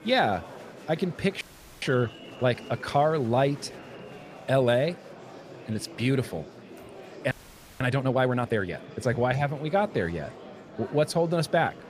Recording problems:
murmuring crowd; noticeable; throughout; 15 dB below the speech
audio freezing; at 1.5 s and at 7.5 s

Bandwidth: 15 kHz